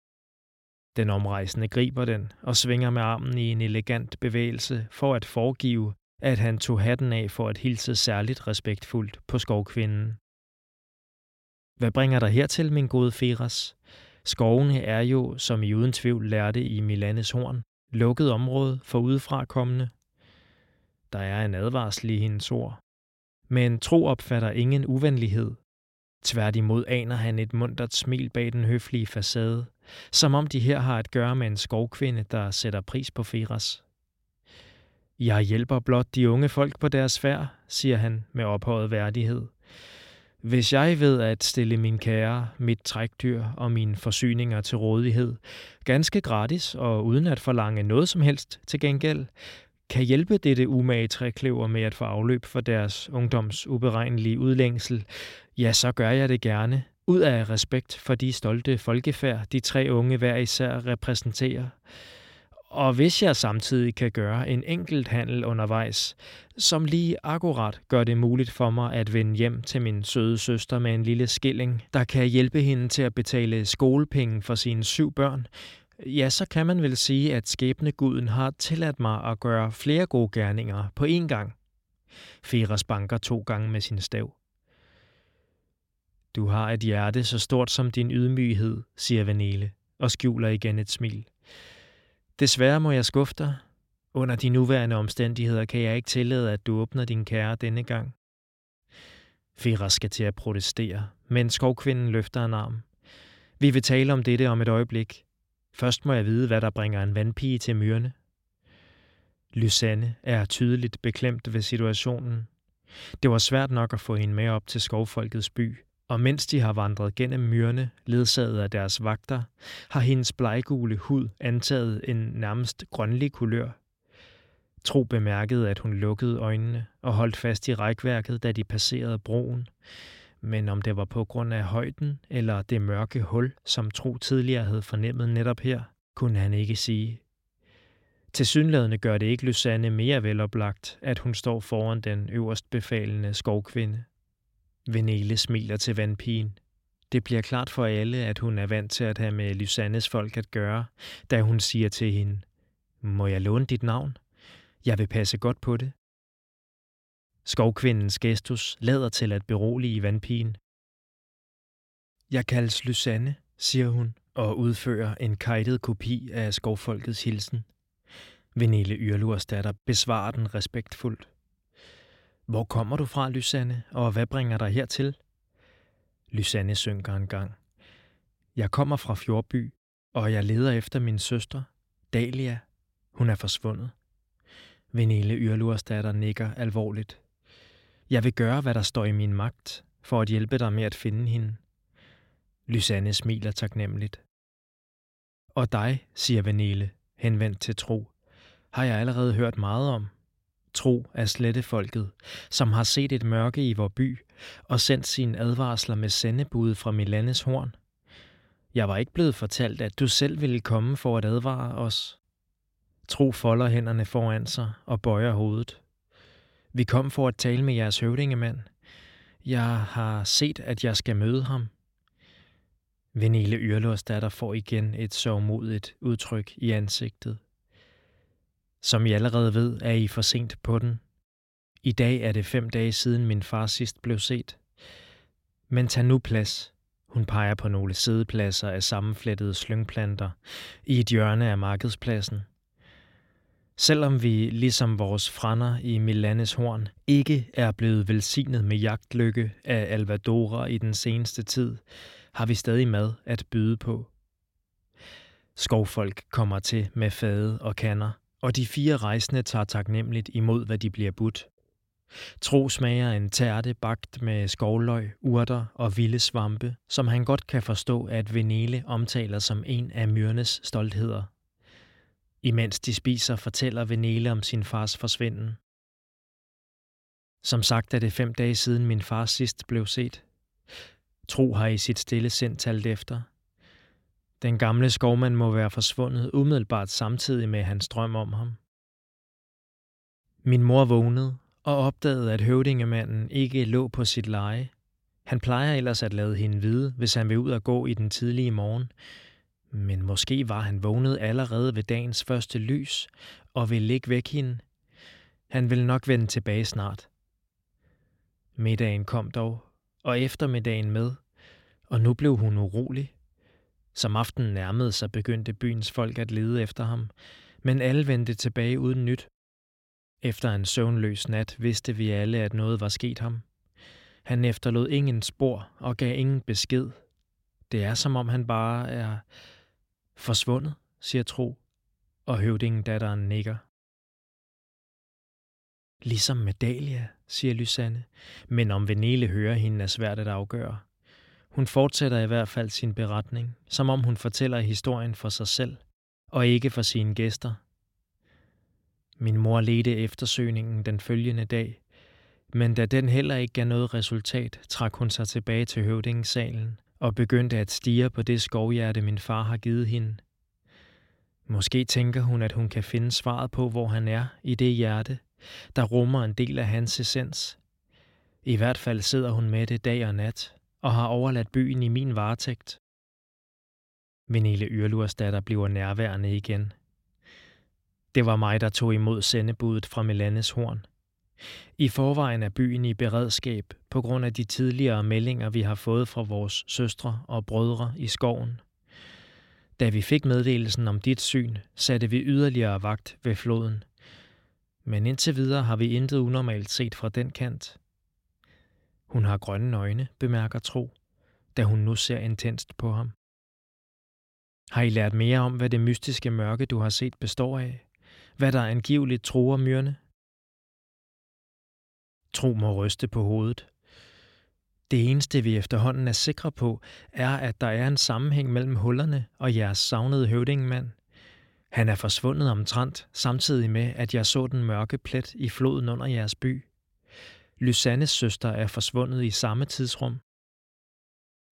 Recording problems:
none

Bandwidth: 16.5 kHz